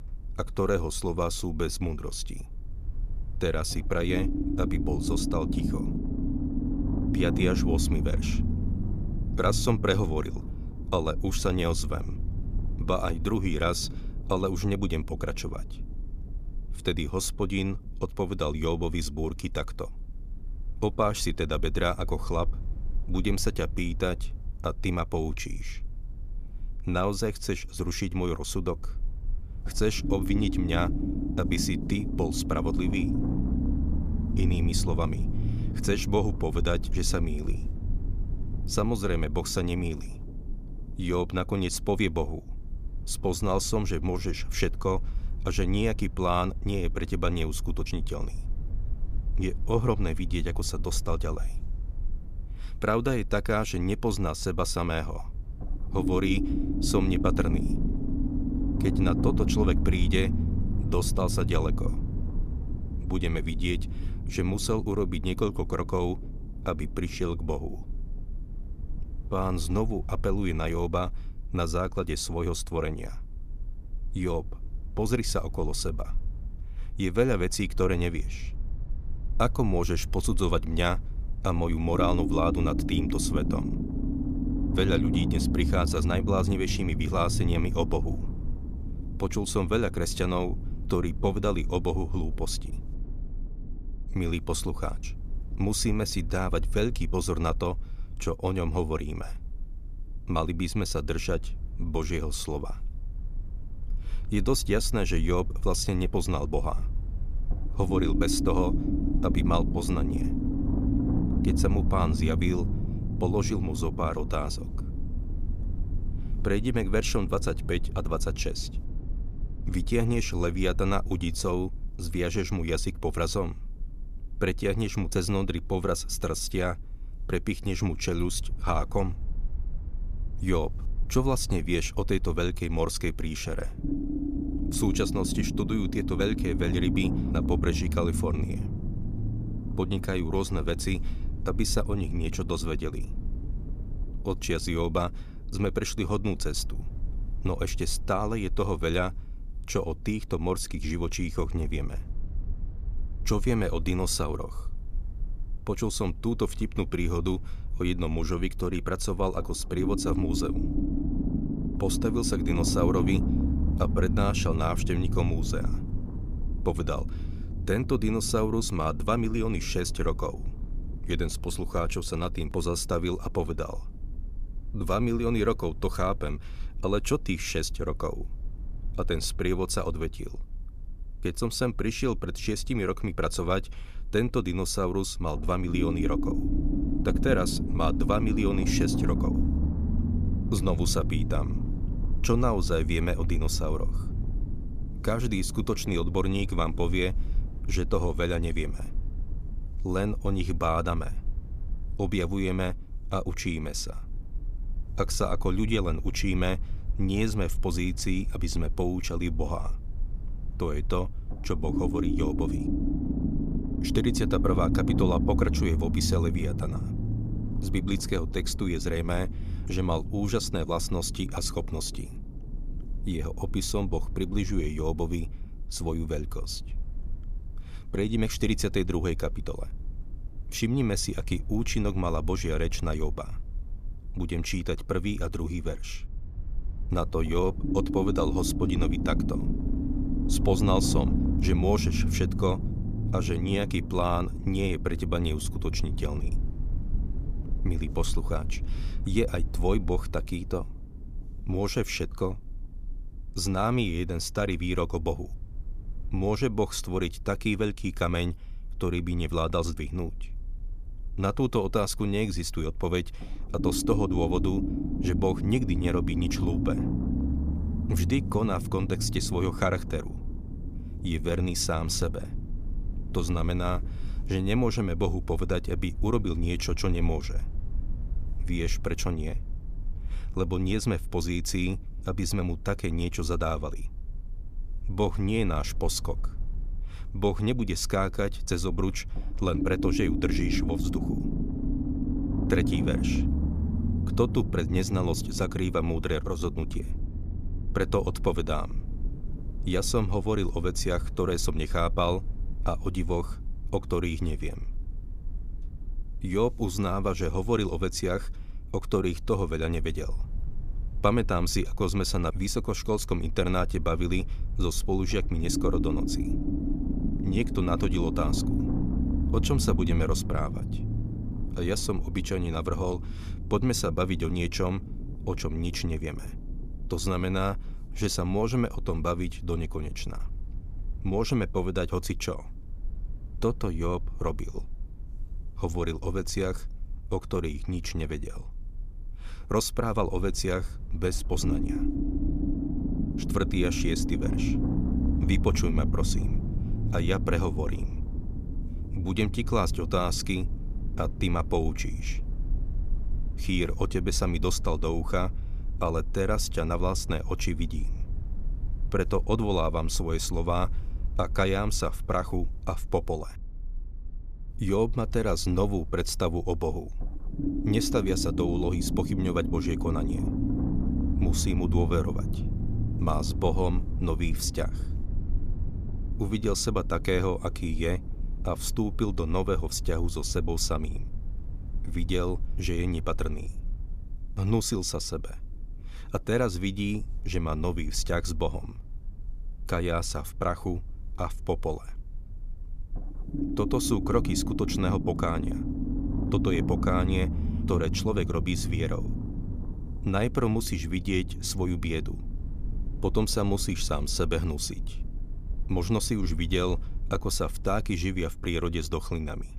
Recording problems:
low rumble; loud; throughout; 8 dB below the speech

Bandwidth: 14.5 kHz